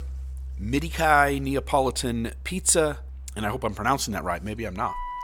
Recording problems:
background music; noticeable; throughout; 15 dB below the speech

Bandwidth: 17.5 kHz